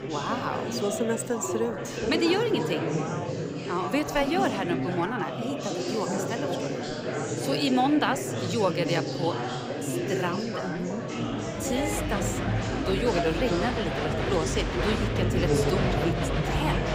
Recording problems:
chatter from many people; very loud; throughout; as loud as the speech

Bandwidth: 15.5 kHz